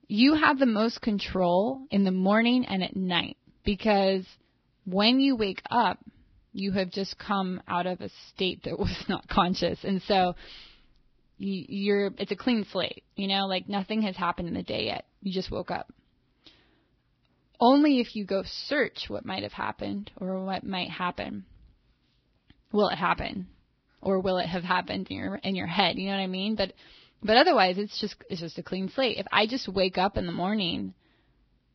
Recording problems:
garbled, watery; badly; nothing above 5 kHz

